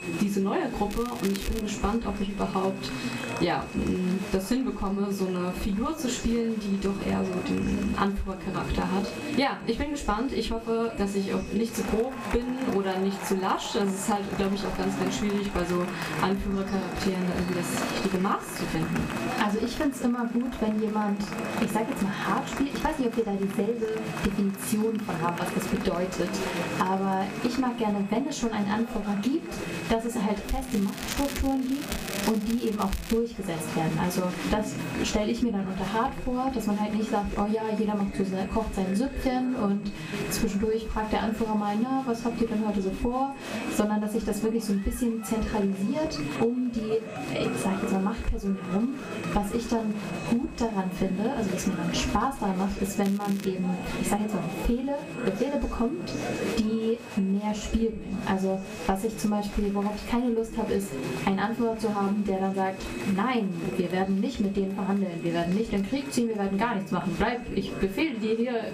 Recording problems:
off-mic speech; far
room echo; very slight; dies away in 0.3 s
squashed, flat; somewhat
chatter from many people; loud; throughout; 8 dB below the speech
high-pitched whine; noticeable; throughout; 2.5 kHz, 20 dB below the speech
crackling; noticeable; at 1 s, from 30 to 33 s and at 53 s; 10 dB below the speech

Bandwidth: 15 kHz